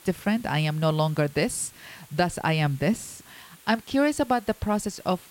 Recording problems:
hiss; faint; throughout; 25 dB below the speech

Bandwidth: 16.5 kHz